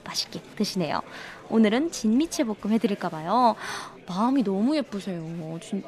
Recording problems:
chatter from many people; faint; throughout; 20 dB below the speech

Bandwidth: 14 kHz